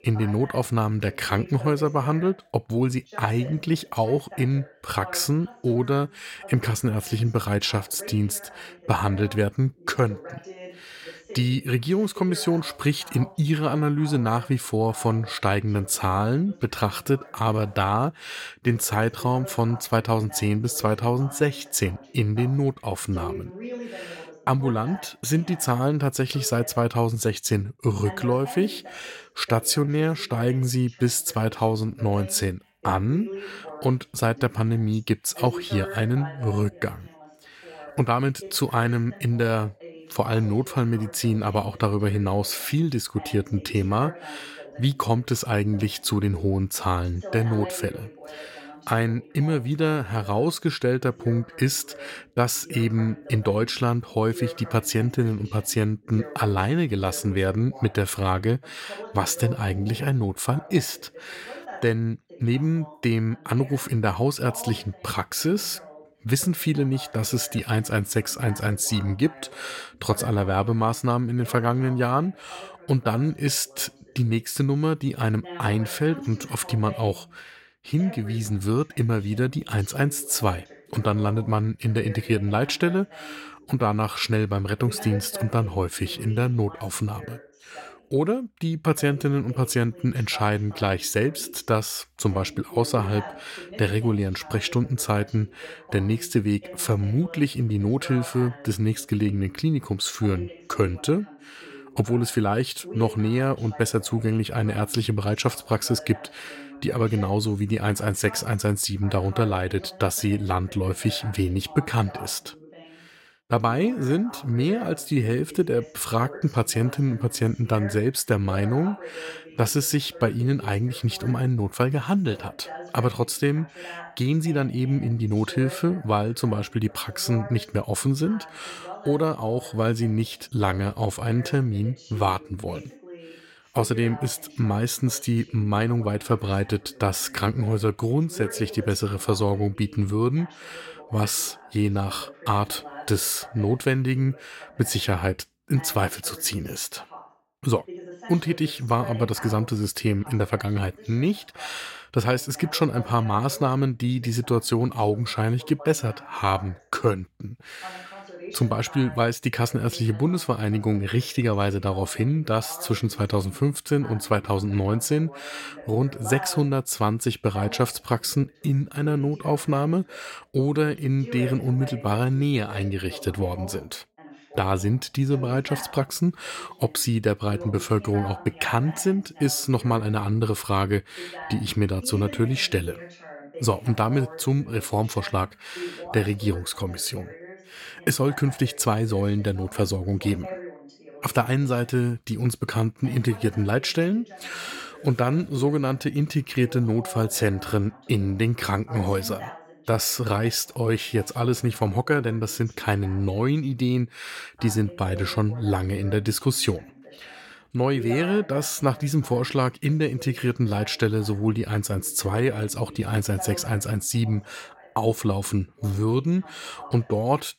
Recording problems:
voice in the background; noticeable; throughout; 20 dB below the speech

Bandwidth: 16.5 kHz